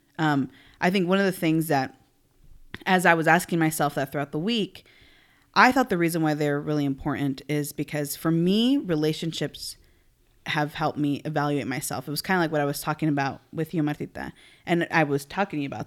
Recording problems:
none

